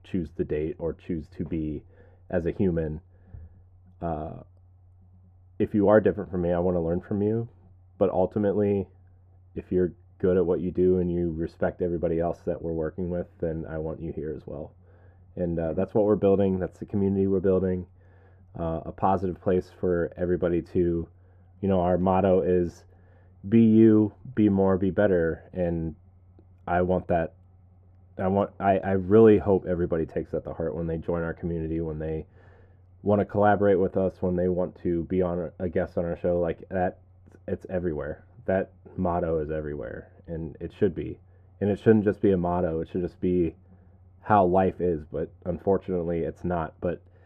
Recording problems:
muffled; very; fading above 2 kHz

